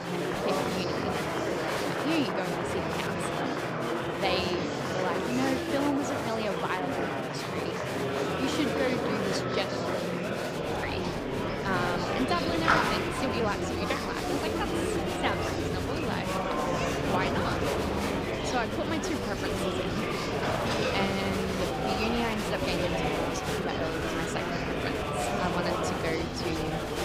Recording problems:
murmuring crowd; very loud; throughout; 4 dB above the speech

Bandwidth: 15.5 kHz